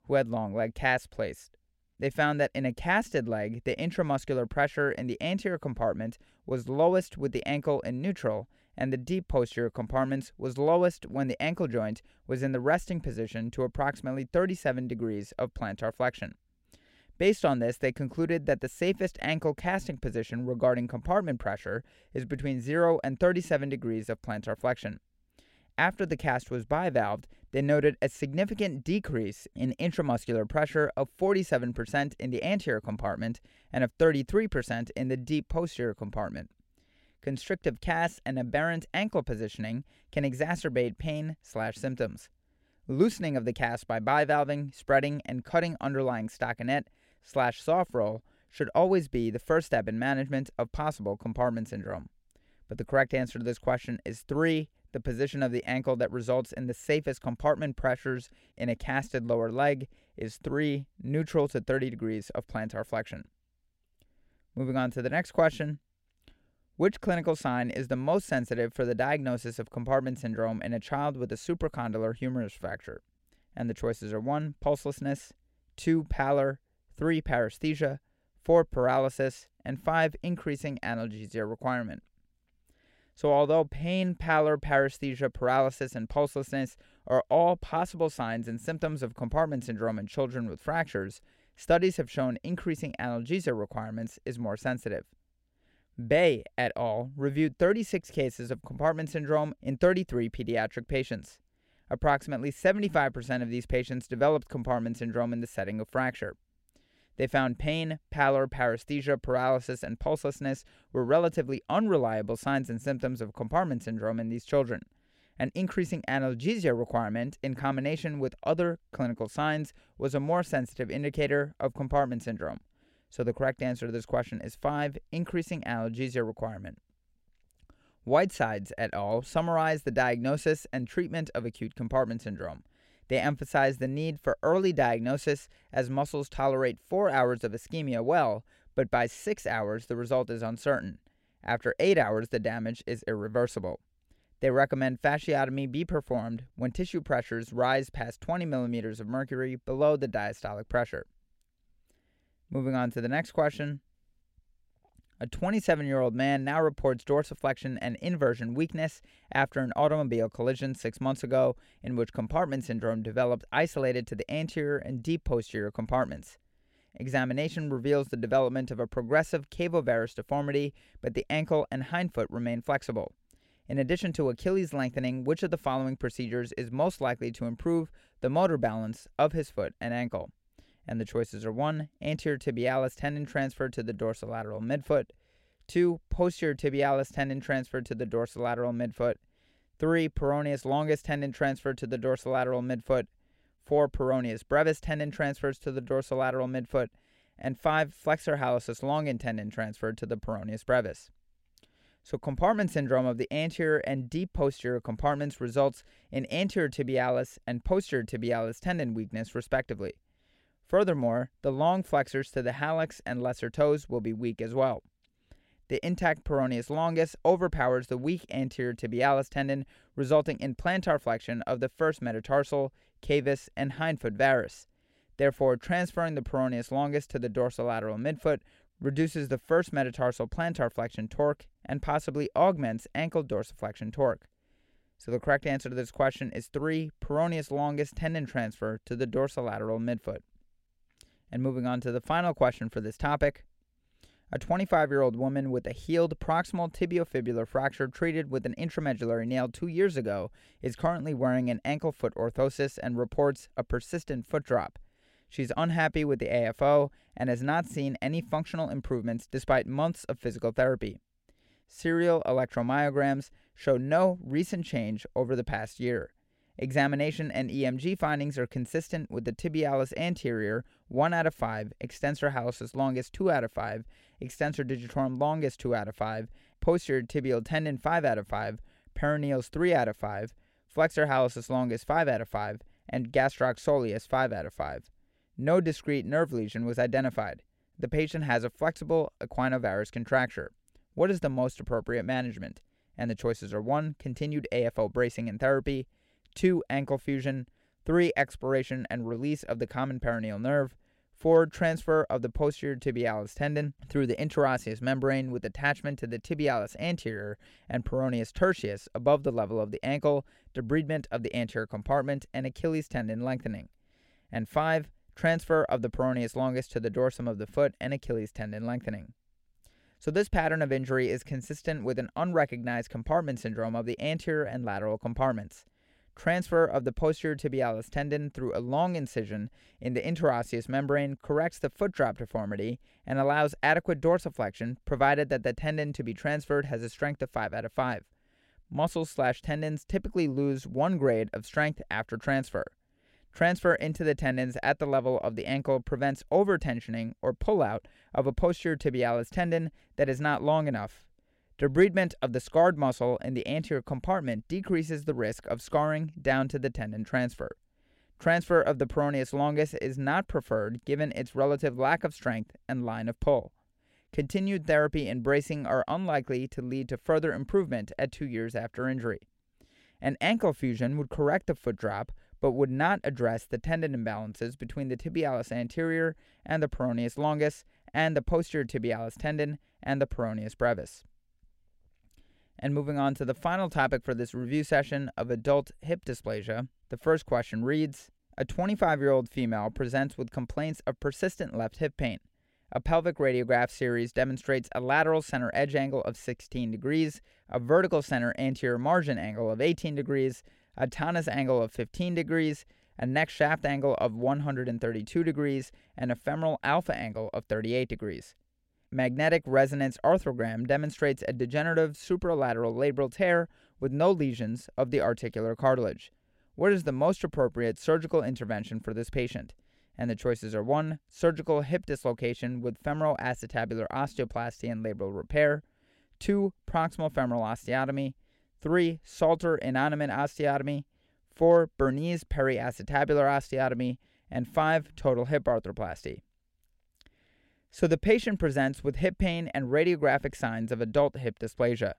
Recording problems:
none

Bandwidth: 16 kHz